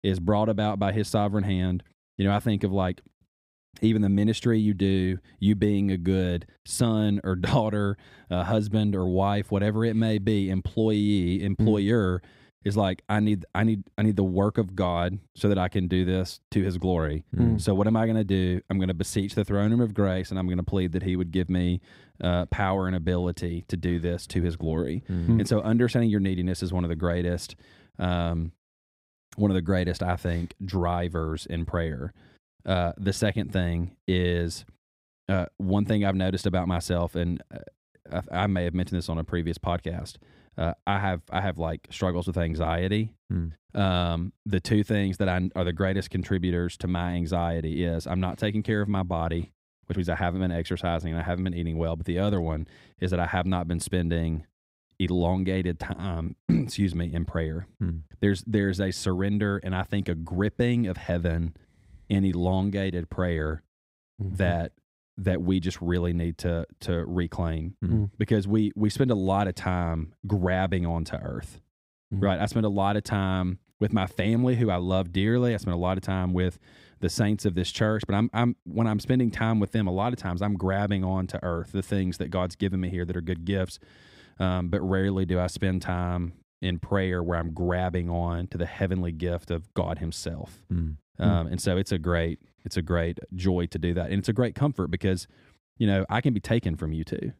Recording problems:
none

